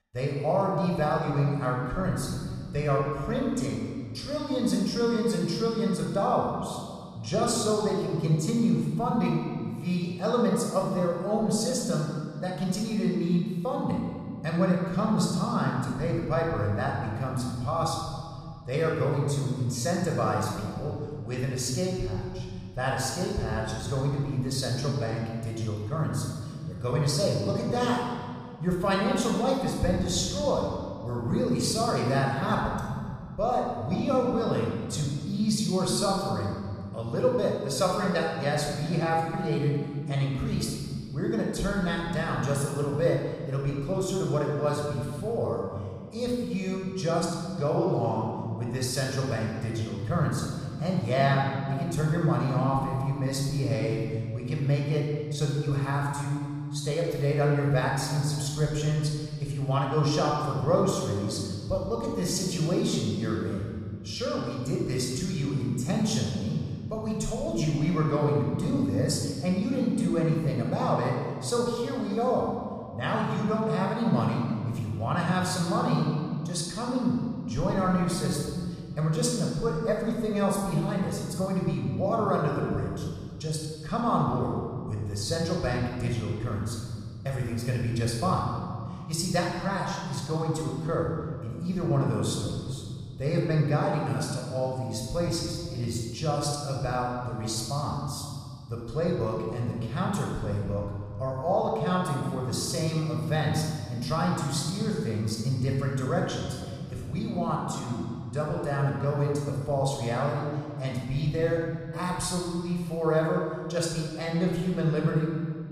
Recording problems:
room echo; noticeable; dies away in 1.9 s
off-mic speech; somewhat distant

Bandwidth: 14.5 kHz